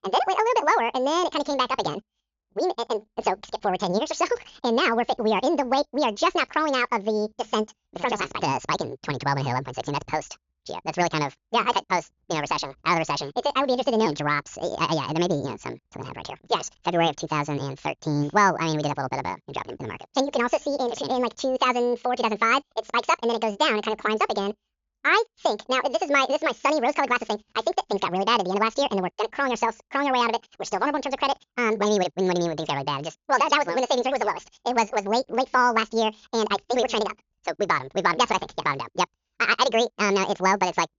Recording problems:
wrong speed and pitch; too fast and too high; 1.7 times normal speed
high frequencies cut off; noticeable; nothing above 7 kHz

